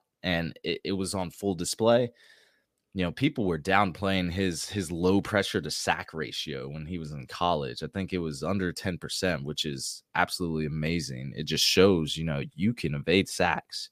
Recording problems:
none

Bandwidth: 15 kHz